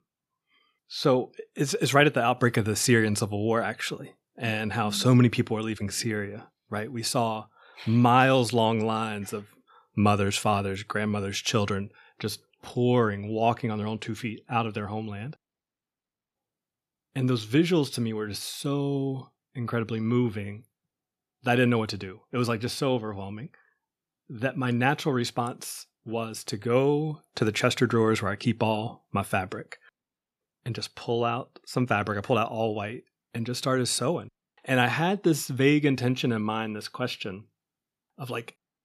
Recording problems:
none

